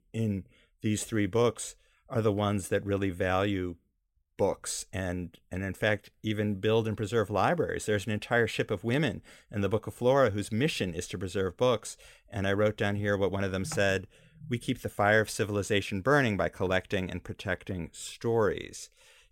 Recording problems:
none

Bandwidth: 16 kHz